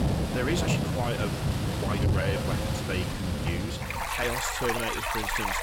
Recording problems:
echo of what is said; noticeable; throughout; 340 ms later, 10 dB below the speech
distortion; slight; 10 dB below the speech
rain or running water; very loud; throughout; 3 dB above the speech
uneven, jittery; strongly; from 0.5 to 5 s

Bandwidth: 16.5 kHz